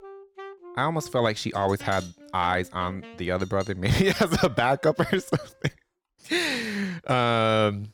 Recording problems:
background music; faint; until 5 s; 20 dB below the speech

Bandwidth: 17.5 kHz